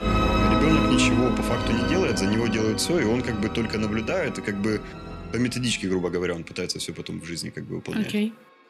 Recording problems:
background music; loud; throughout; as loud as the speech

